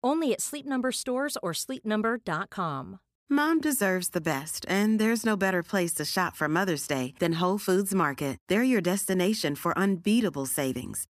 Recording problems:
none

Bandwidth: 14.5 kHz